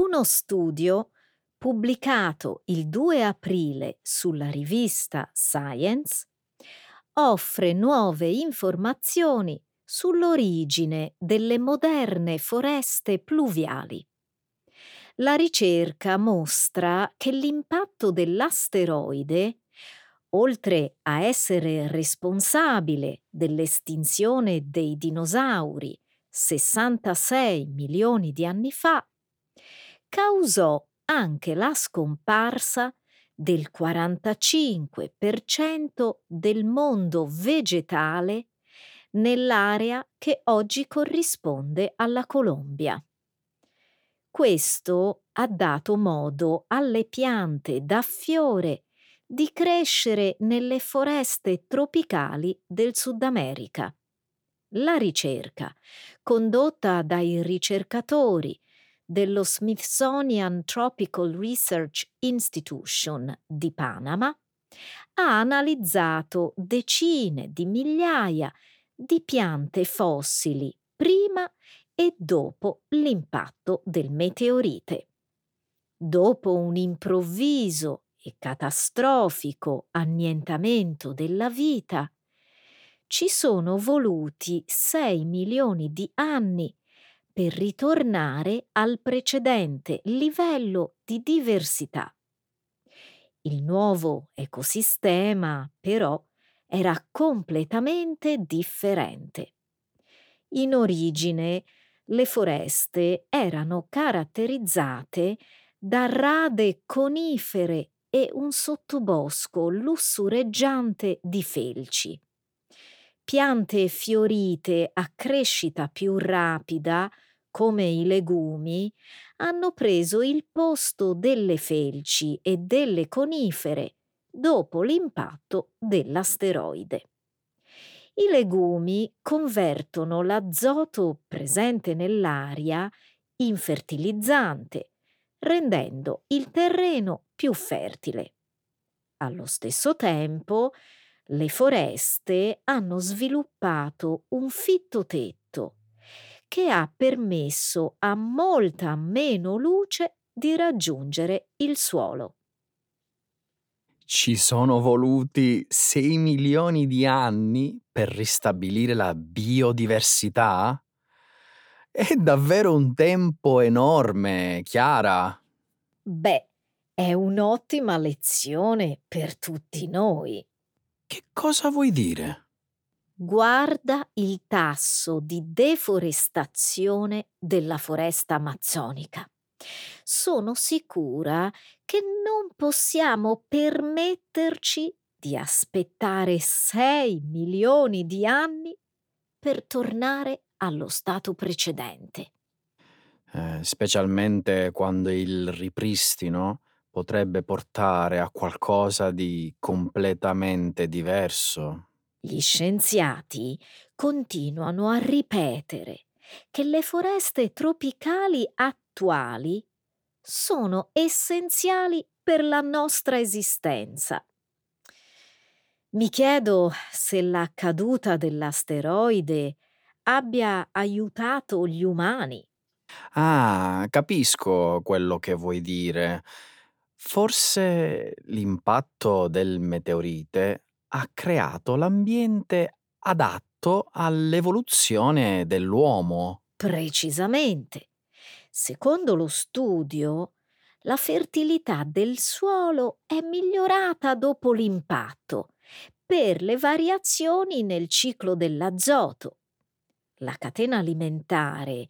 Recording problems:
abrupt cut into speech; at the start

